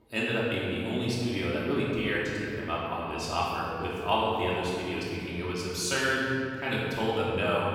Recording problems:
room echo; strong; dies away in 2.3 s
off-mic speech; far

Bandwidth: 16.5 kHz